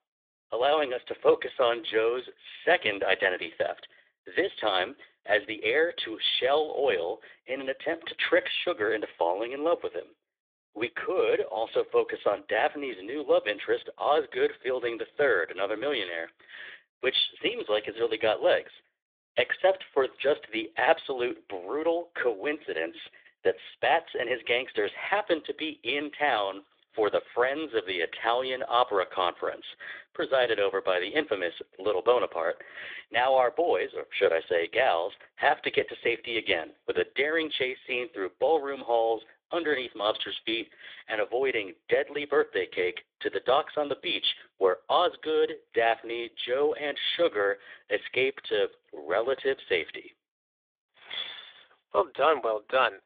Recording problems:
thin; very; fading below 450 Hz
phone-call audio

